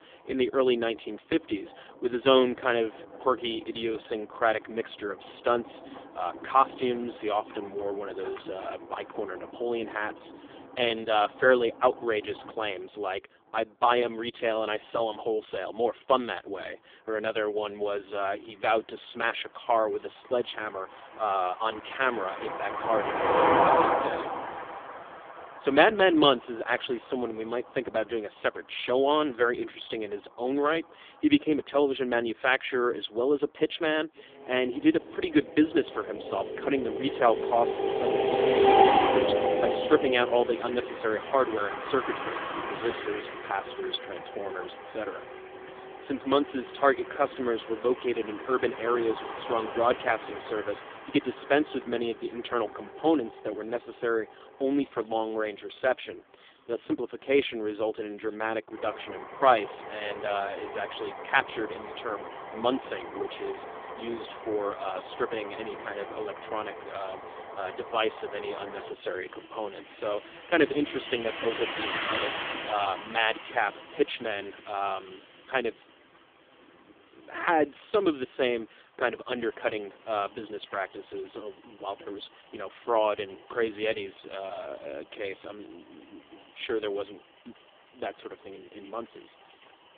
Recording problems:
phone-call audio; poor line; nothing above 3.5 kHz
traffic noise; loud; throughout; 3 dB below the speech

